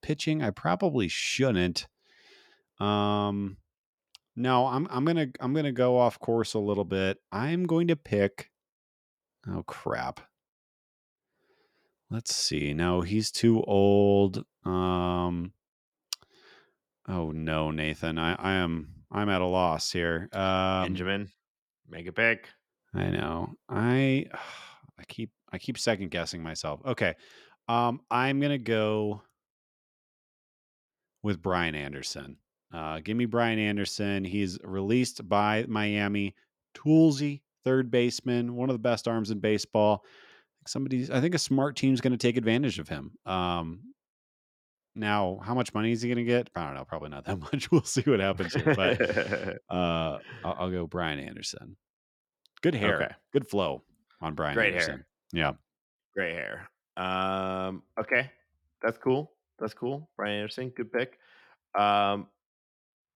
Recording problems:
none

